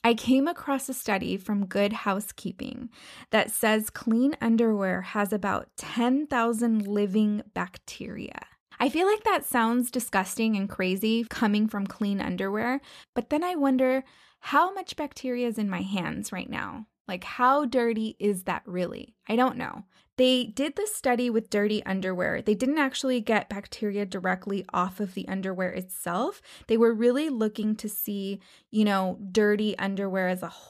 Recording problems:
none

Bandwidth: 14.5 kHz